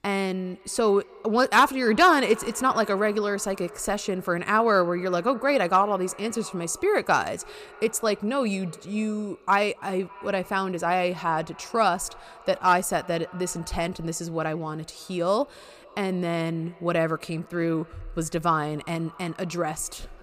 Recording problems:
echo of what is said; faint; throughout; 280 ms later, 20 dB below the speech

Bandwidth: 15 kHz